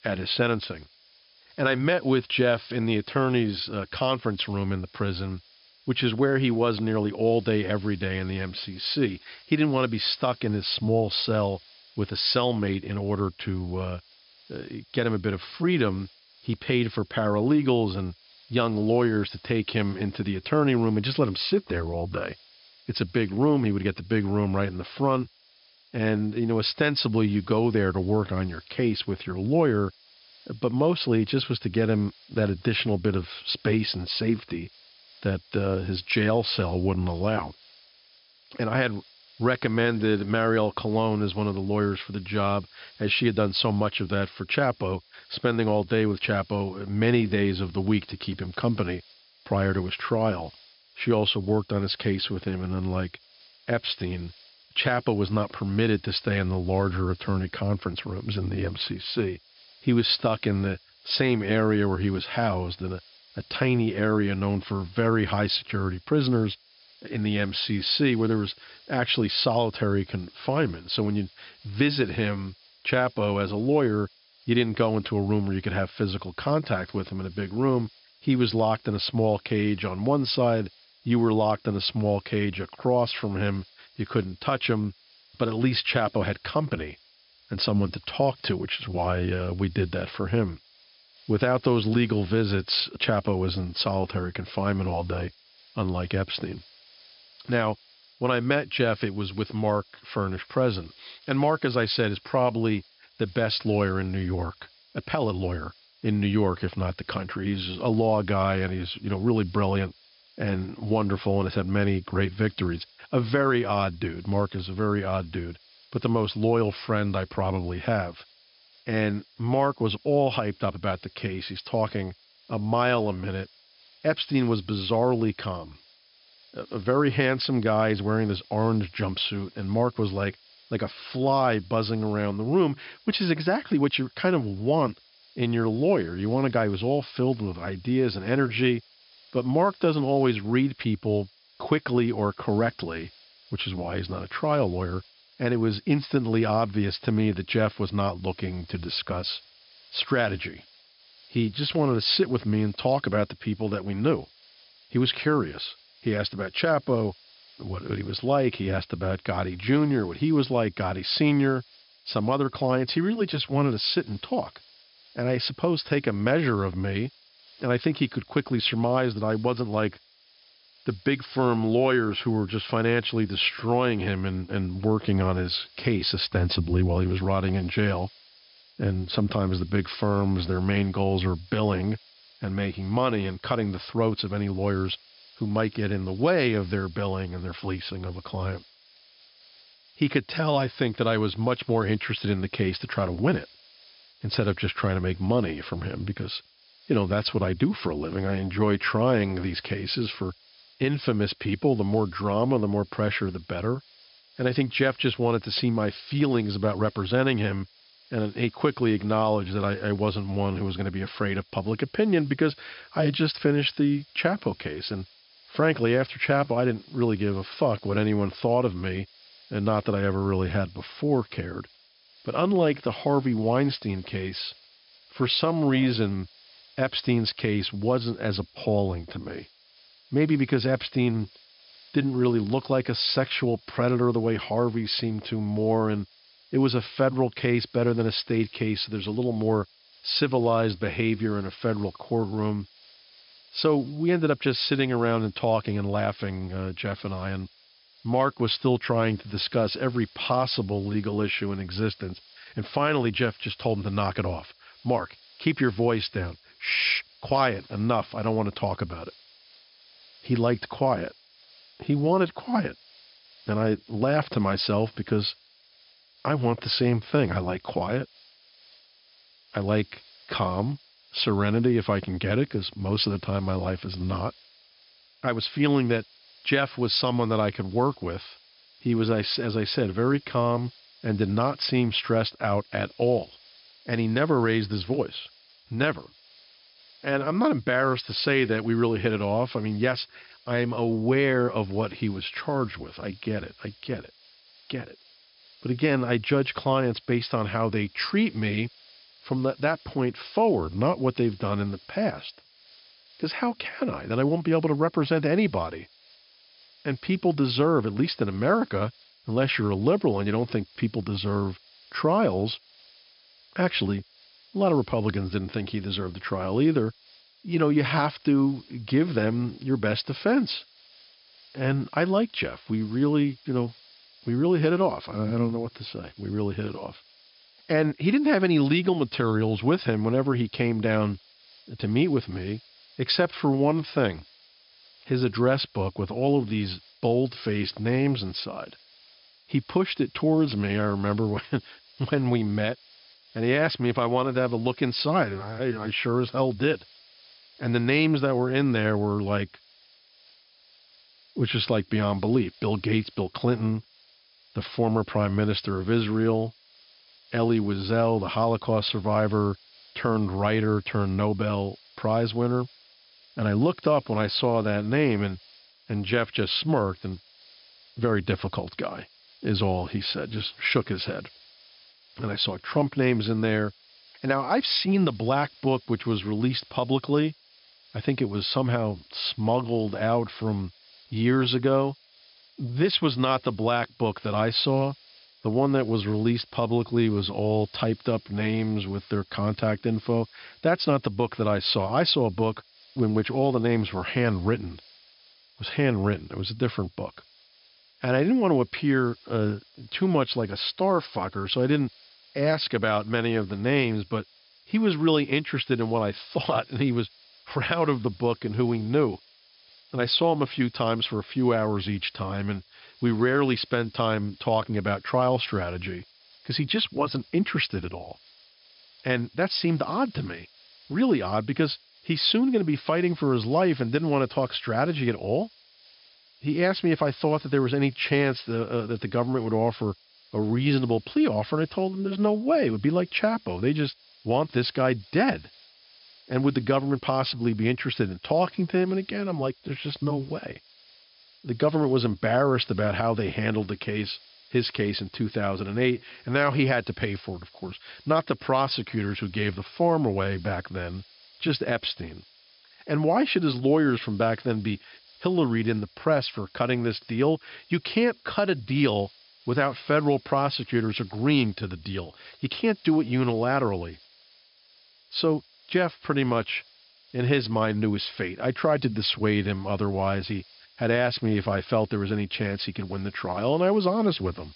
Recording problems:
high frequencies cut off; noticeable; nothing above 5.5 kHz
hiss; faint; throughout; 25 dB below the speech

